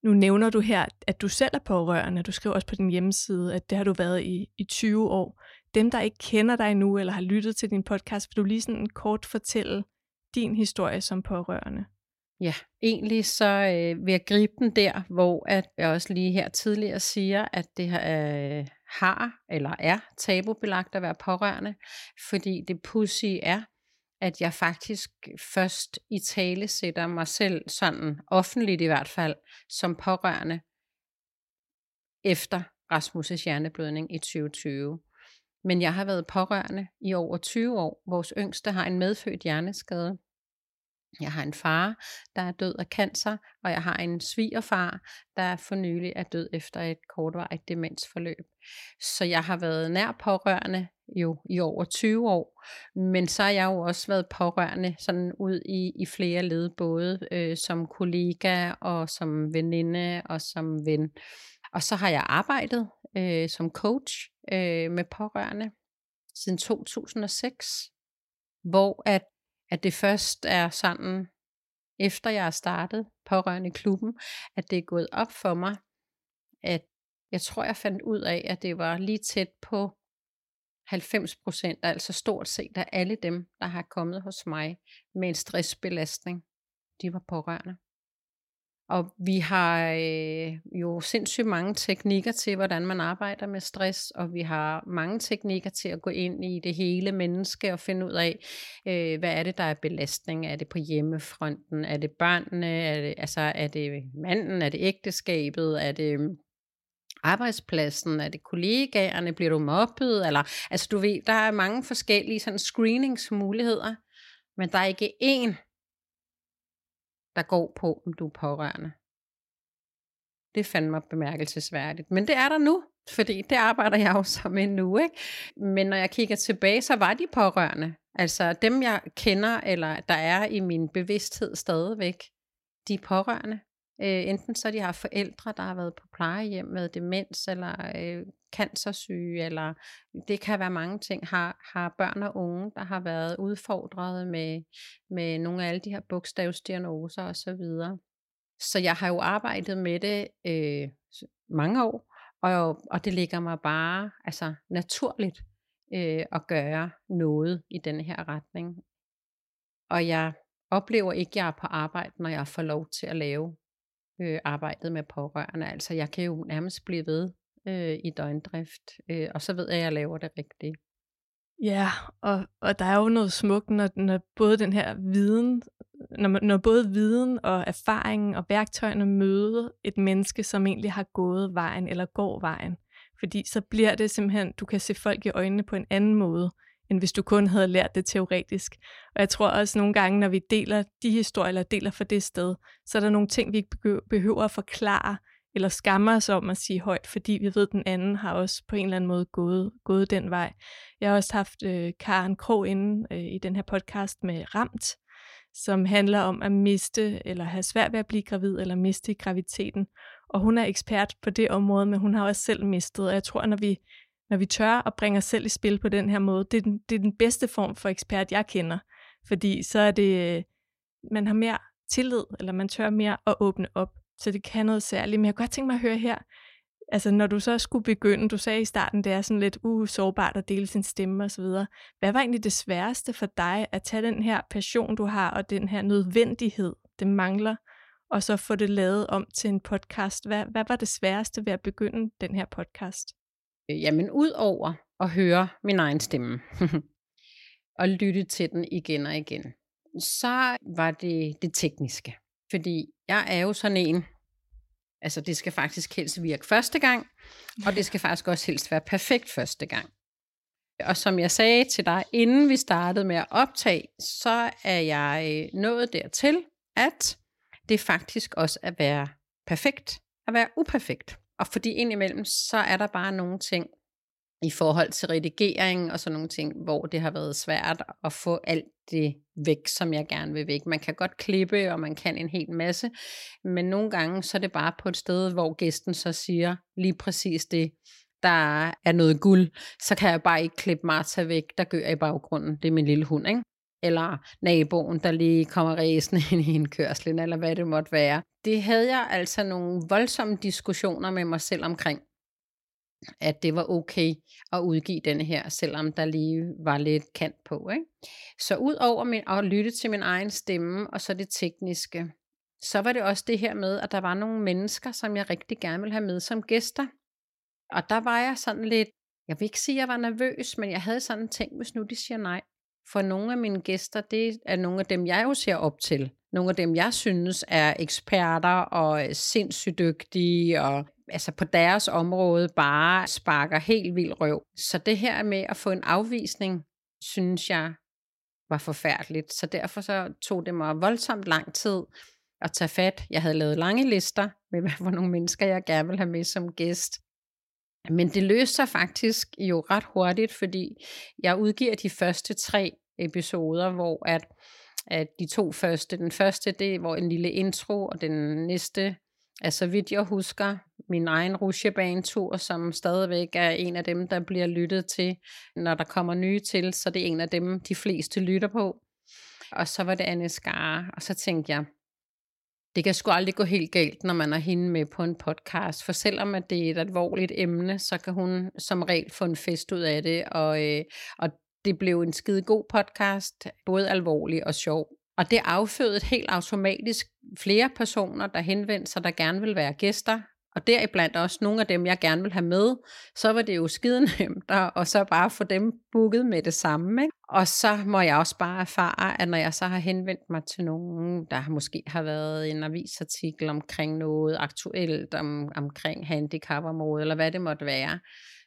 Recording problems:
none

